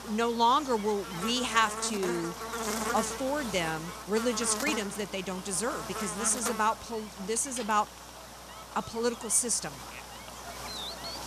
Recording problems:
electrical hum; loud; throughout; 60 Hz, 8 dB below the speech

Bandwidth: 14 kHz